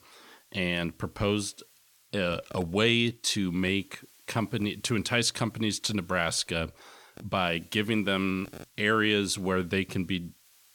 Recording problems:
hiss; faint; throughout; 30 dB below the speech

